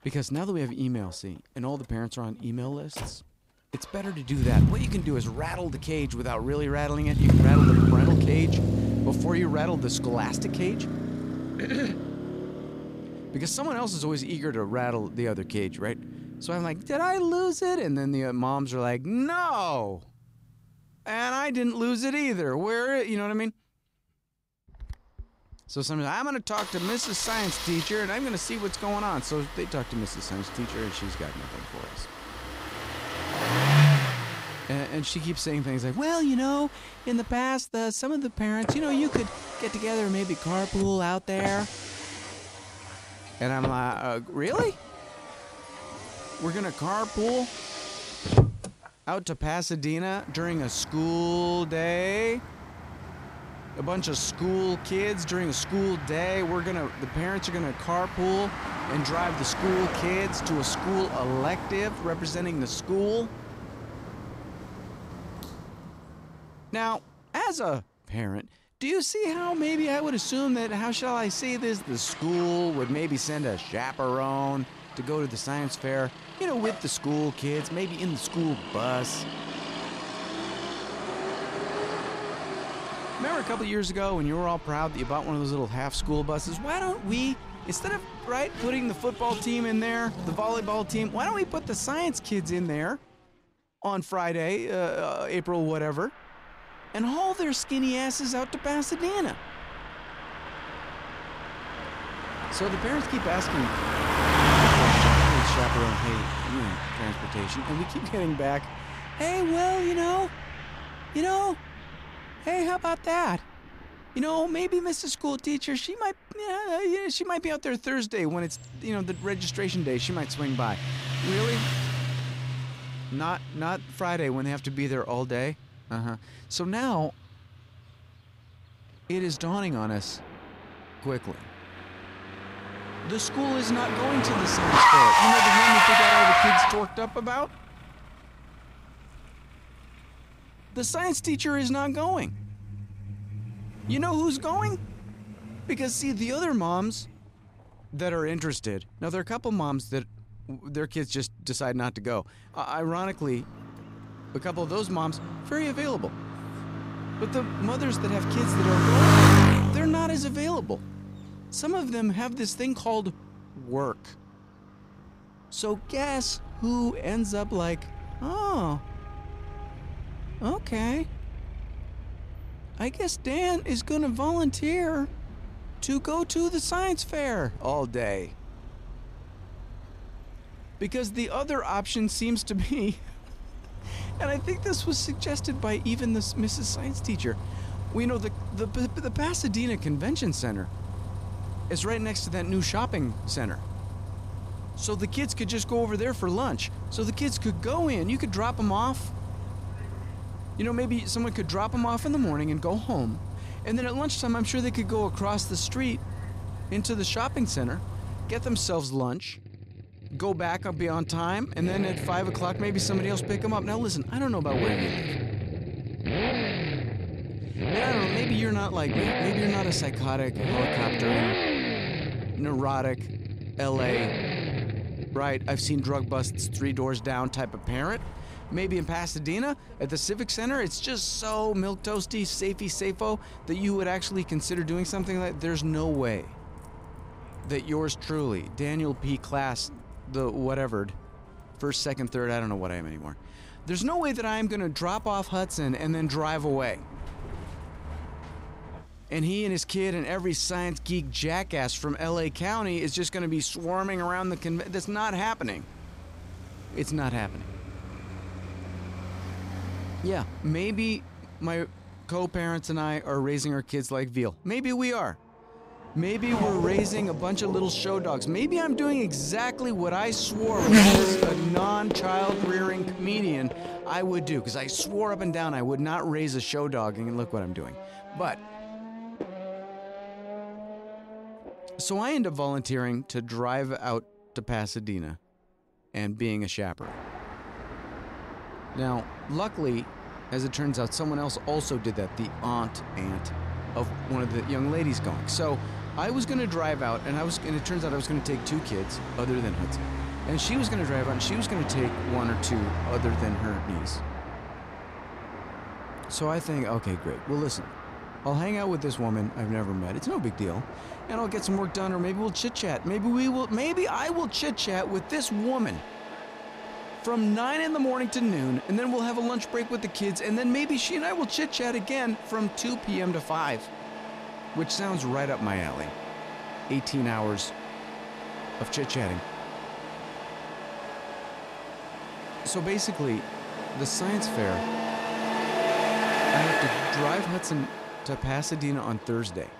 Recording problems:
traffic noise; loud; throughout; 1 dB below the speech

